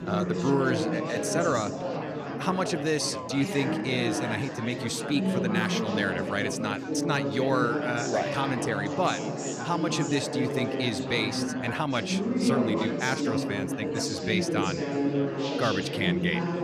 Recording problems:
chatter from many people; loud; throughout; as loud as the speech

